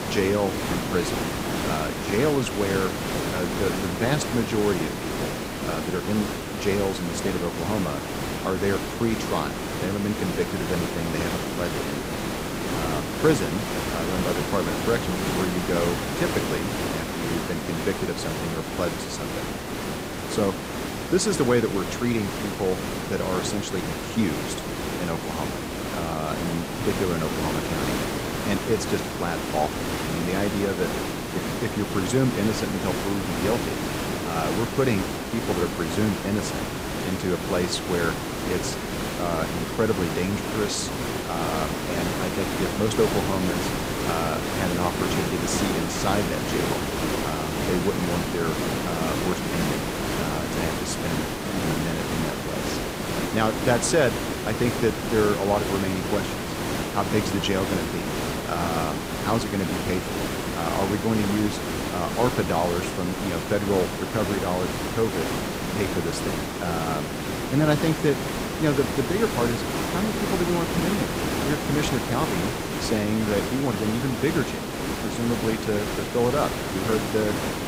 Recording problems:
hiss; loud; throughout; 1 dB below the speech

